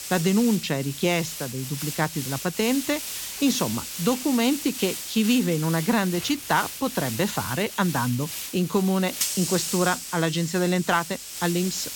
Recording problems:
high frequencies cut off; noticeable; nothing above 8 kHz
hiss; loud; throughout; 6 dB below the speech

